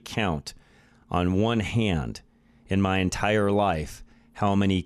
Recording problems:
none

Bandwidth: 13.5 kHz